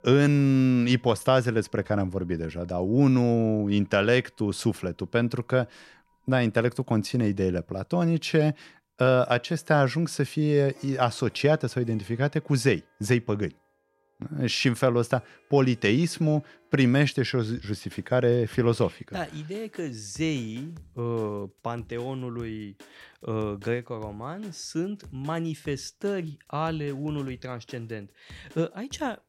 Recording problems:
background music; faint; throughout; 30 dB below the speech

